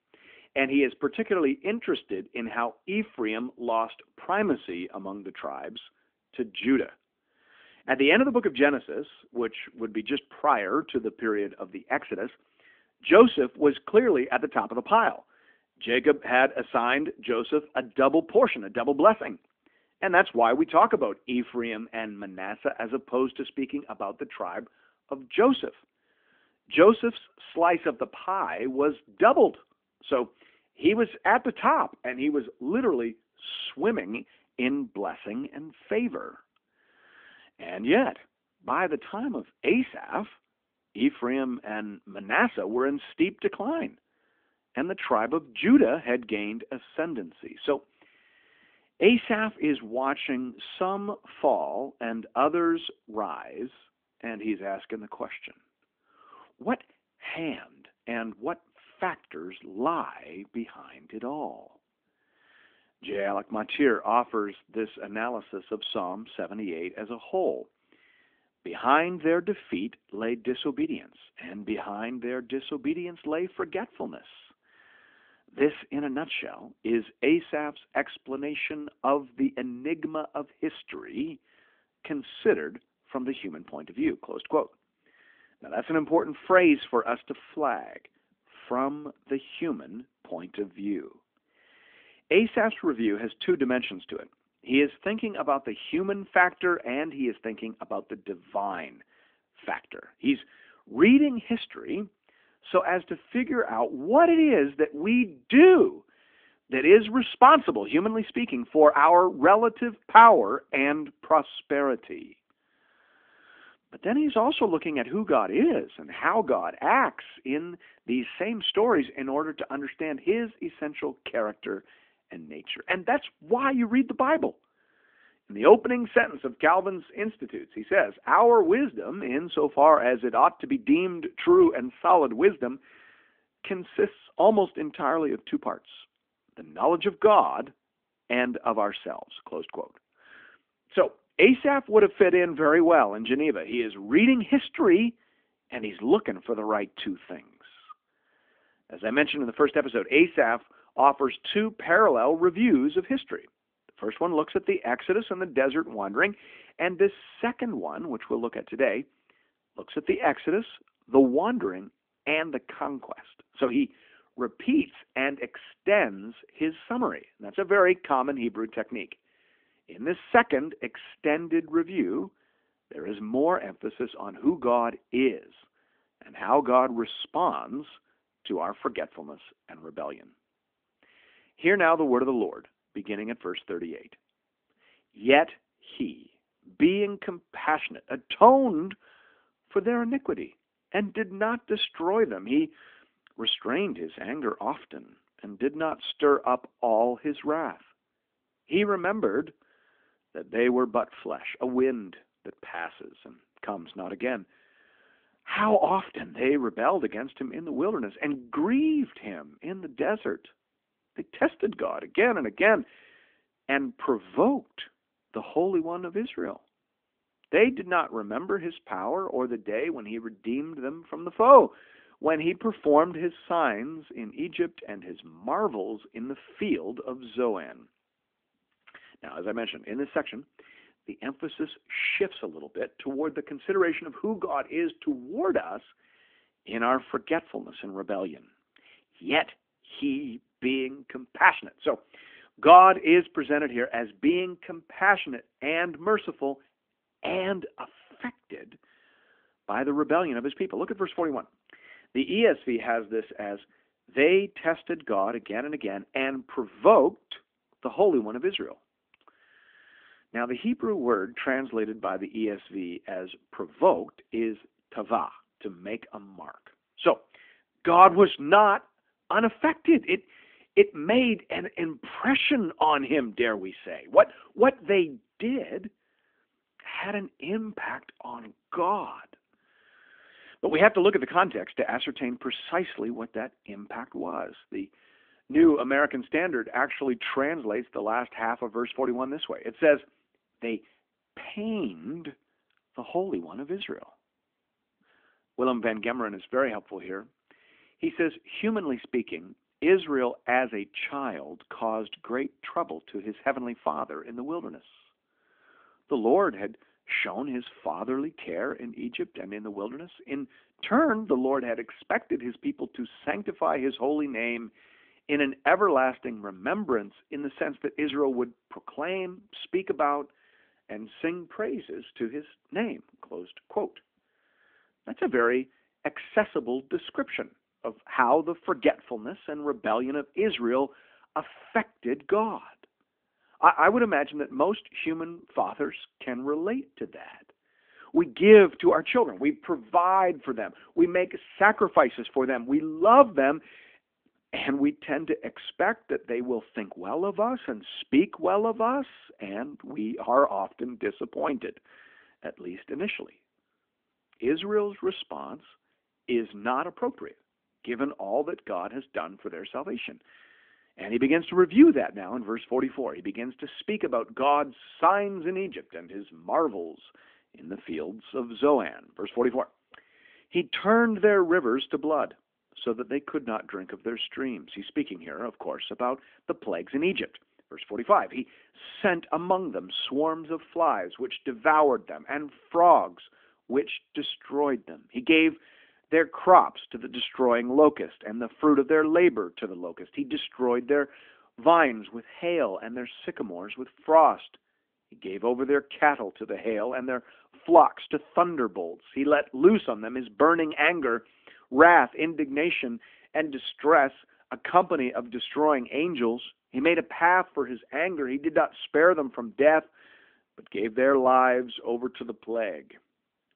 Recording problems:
phone-call audio; nothing above 3.5 kHz

